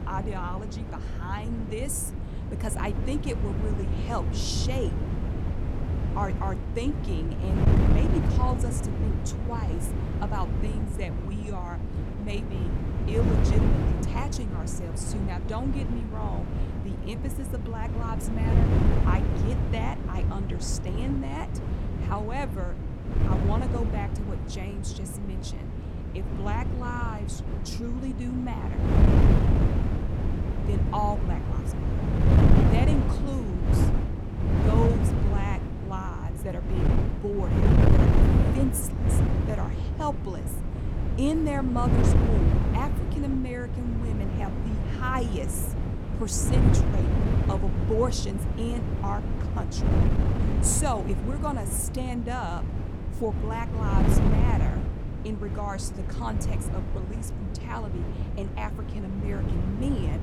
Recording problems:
wind noise on the microphone; heavy; 1 dB below the speech

